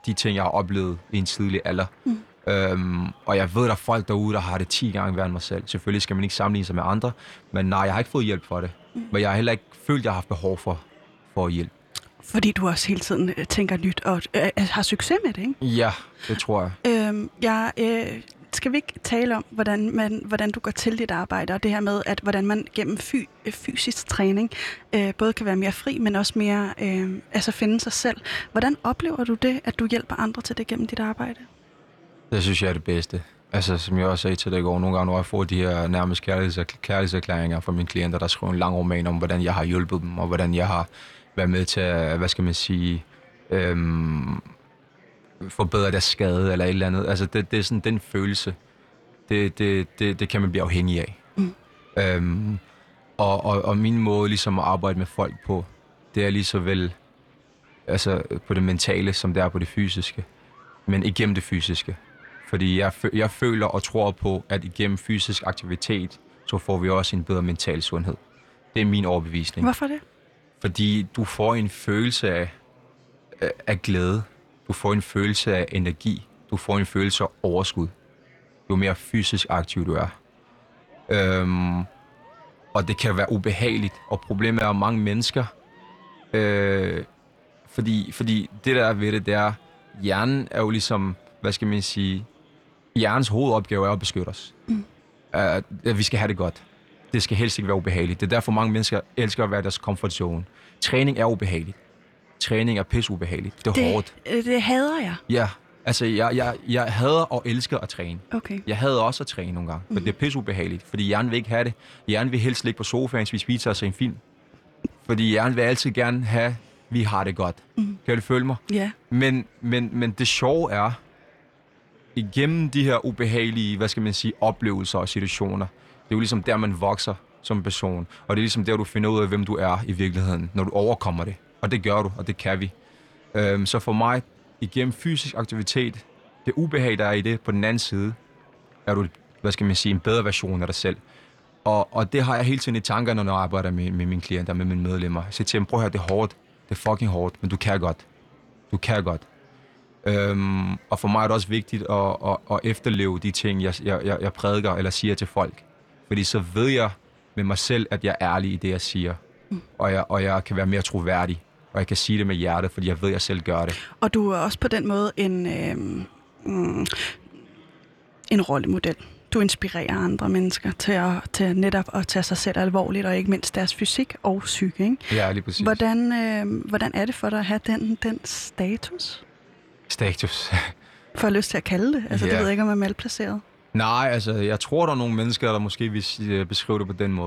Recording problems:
murmuring crowd; faint; throughout; 30 dB below the speech
abrupt cut into speech; at the end

